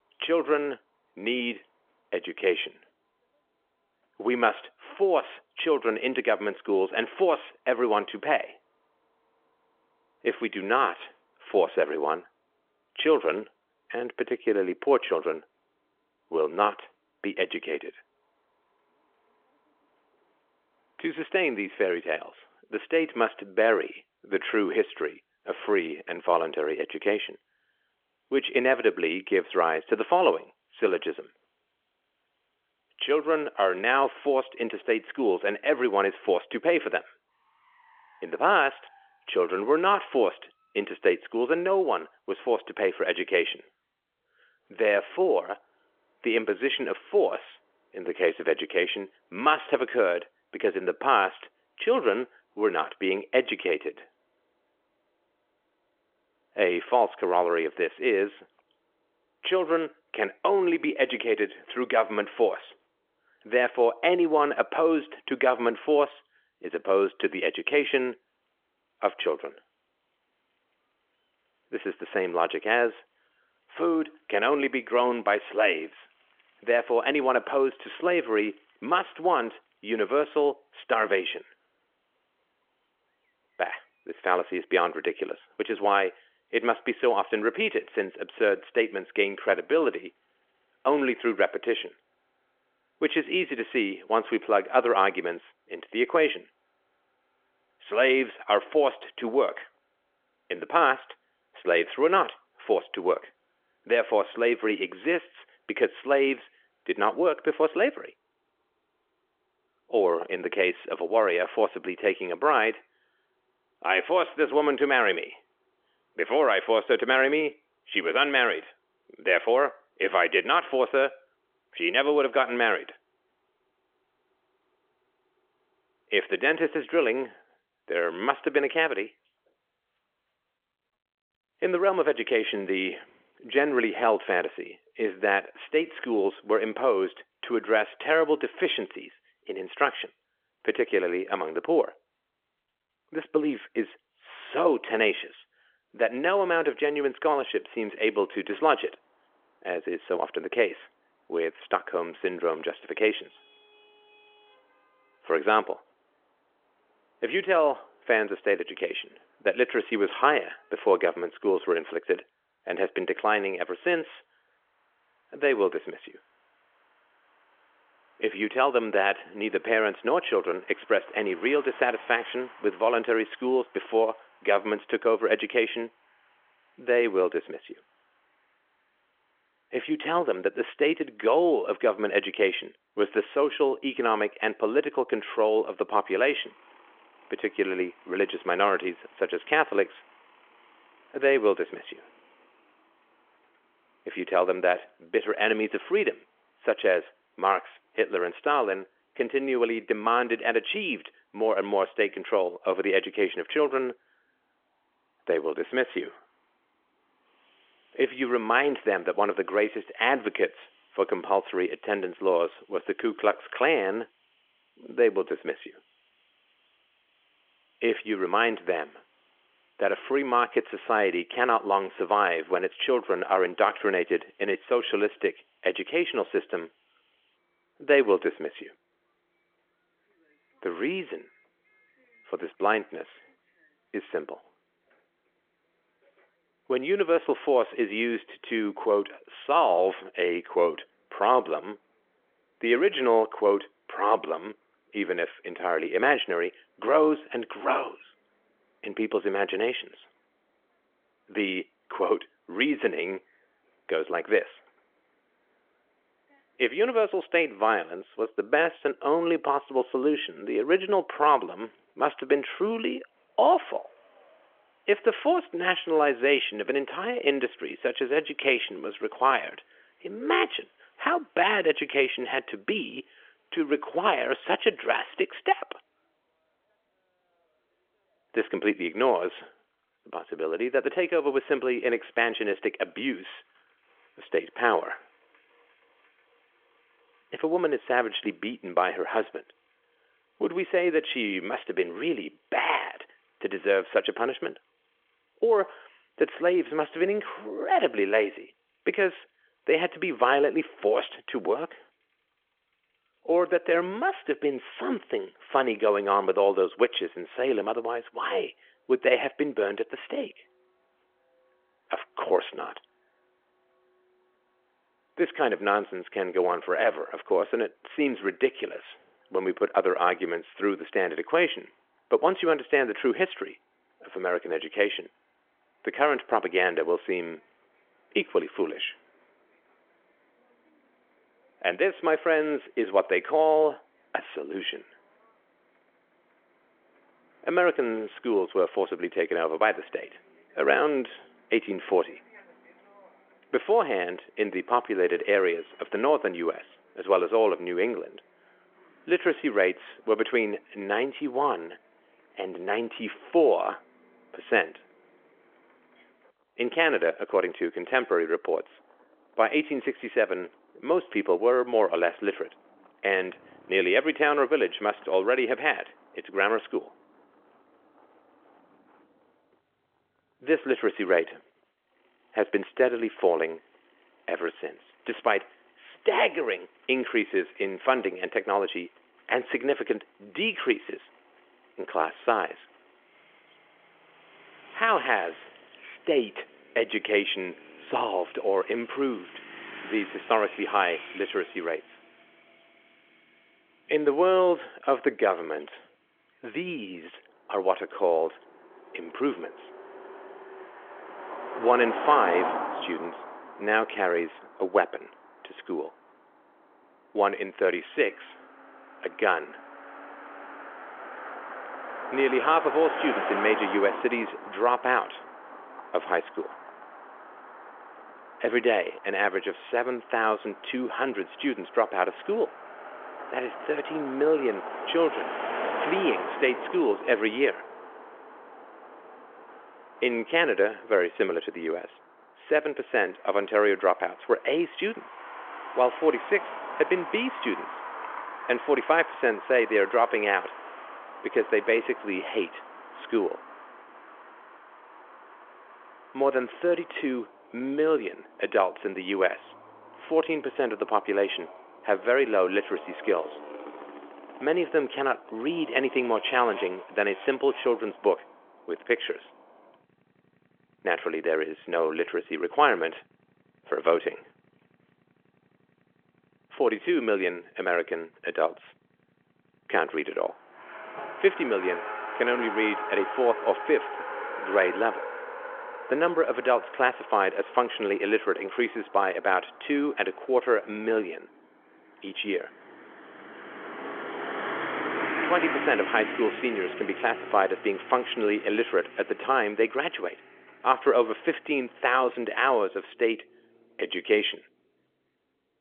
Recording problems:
phone-call audio; nothing above 3.5 kHz
traffic noise; noticeable; throughout; 15 dB below the speech

